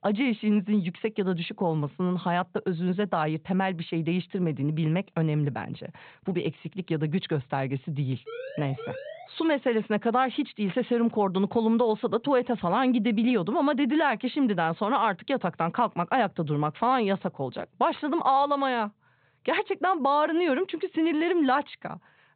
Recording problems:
high frequencies cut off; severe; nothing above 4 kHz
siren; faint; from 8.5 to 9.5 s; peak 10 dB below the speech

